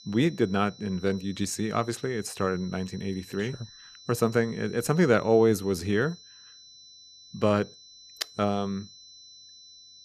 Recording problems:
high-pitched whine; faint; throughout; 4 kHz, 20 dB below the speech

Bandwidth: 14.5 kHz